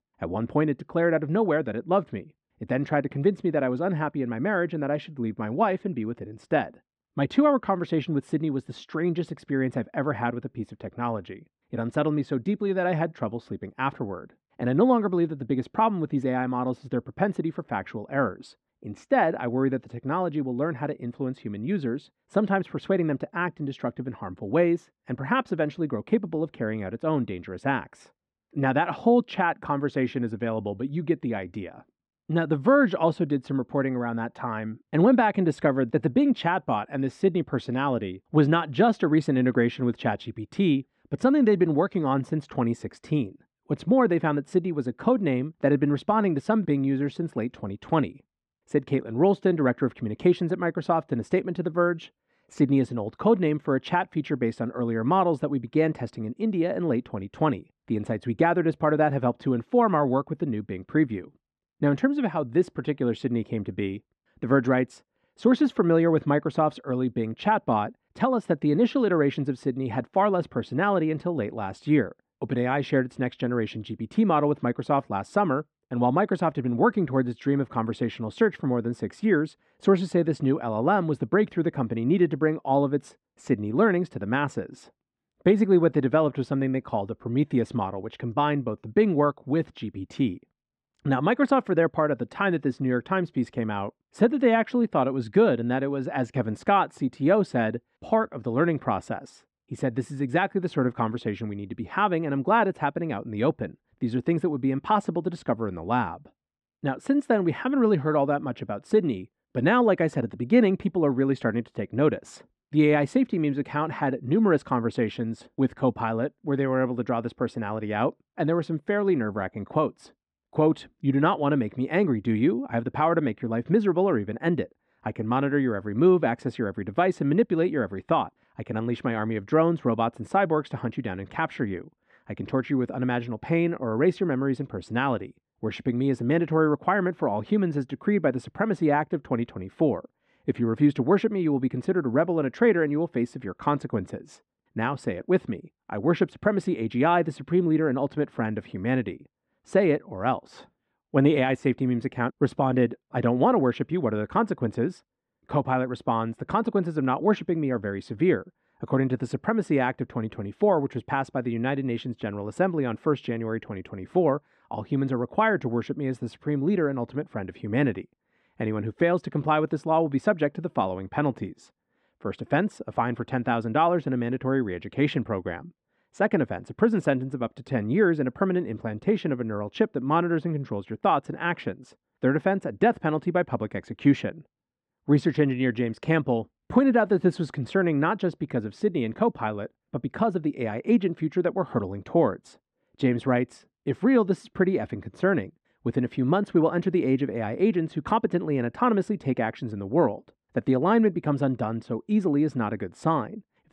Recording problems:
muffled; slightly; fading above 3 kHz

